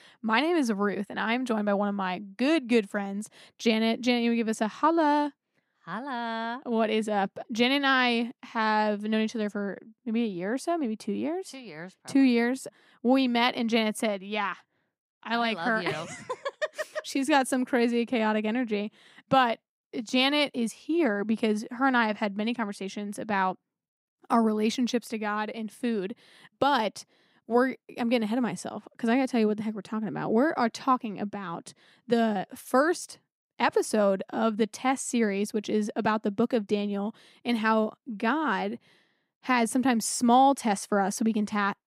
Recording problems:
none

